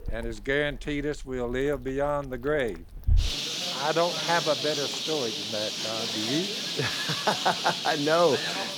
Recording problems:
animal sounds; loud; throughout; as loud as the speech

